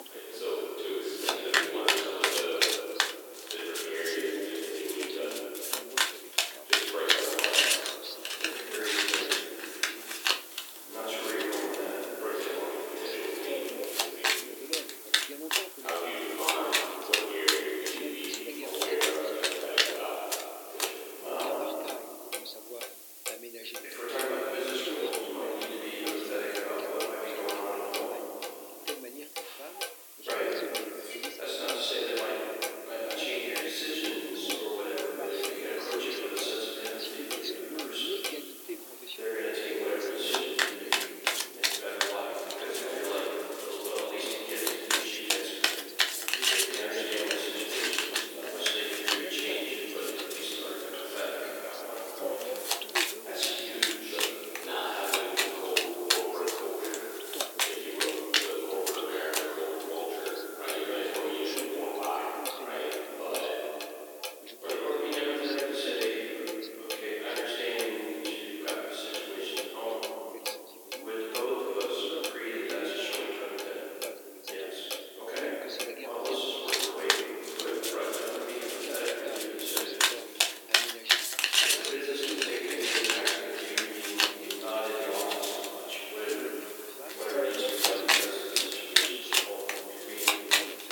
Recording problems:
room echo; strong; dies away in 2.7 s
off-mic speech; far
thin; very; fading below 350 Hz
household noises; very loud; throughout; 4 dB above the speech
voice in the background; noticeable; throughout; 10 dB below the speech
hiss; noticeable; throughout; 10 dB below the speech
clattering dishes; noticeable; at 31 s; peak 8 dB below the speech

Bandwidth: 18 kHz